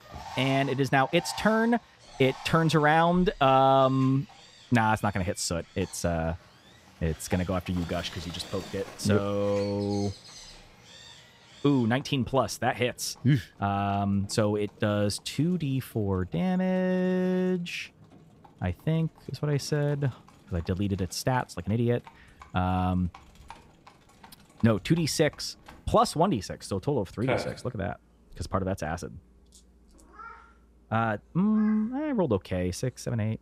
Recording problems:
animal sounds; noticeable; throughout; 20 dB below the speech

